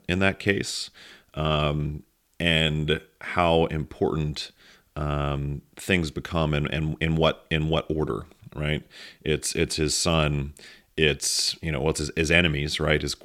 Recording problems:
none

